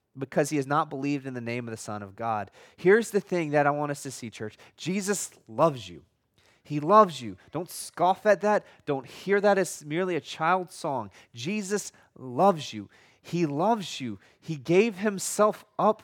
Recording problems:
none

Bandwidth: 18 kHz